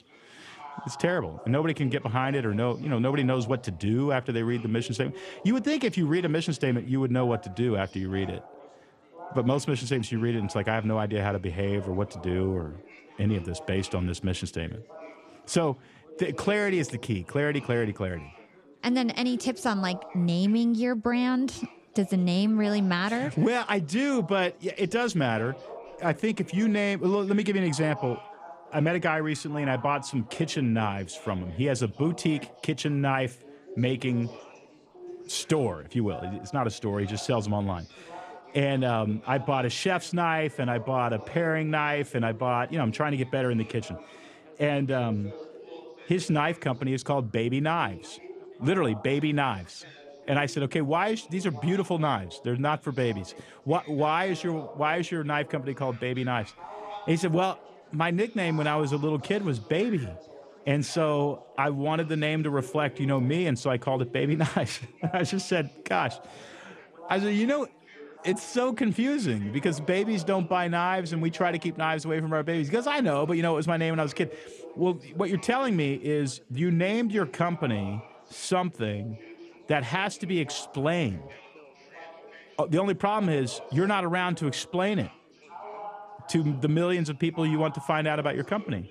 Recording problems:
chatter from many people; noticeable; throughout; 20 dB below the speech

